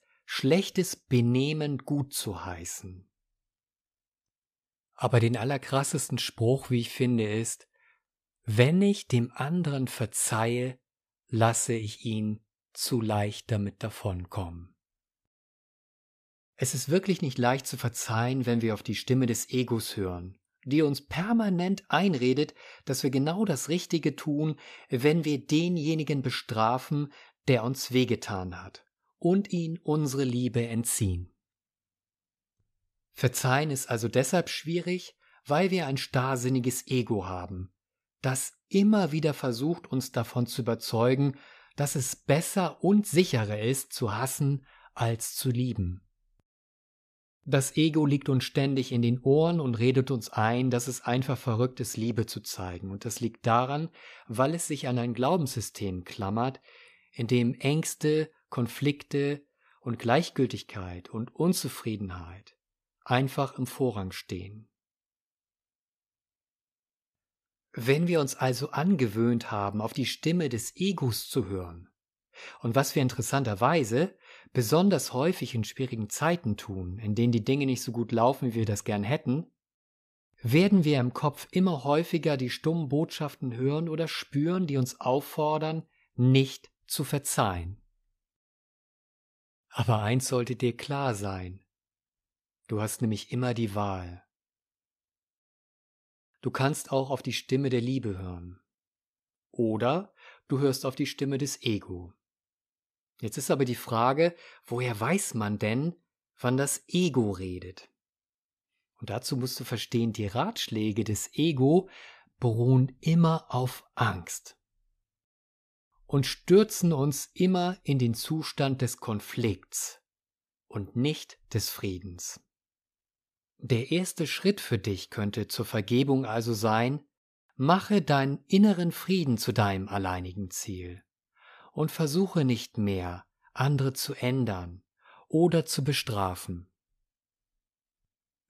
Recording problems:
none

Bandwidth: 14.5 kHz